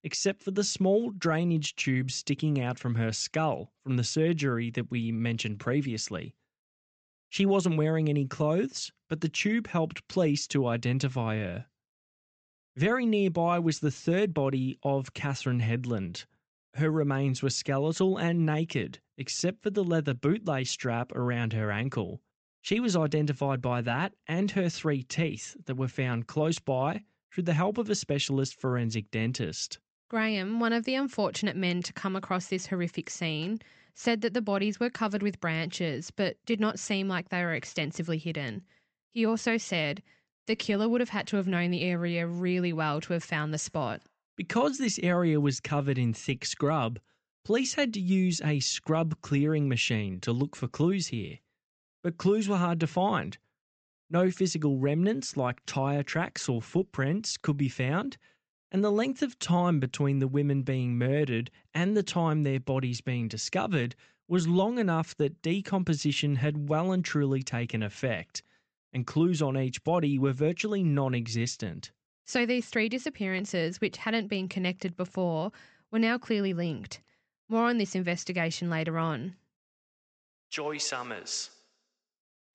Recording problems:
high frequencies cut off; noticeable; nothing above 8 kHz

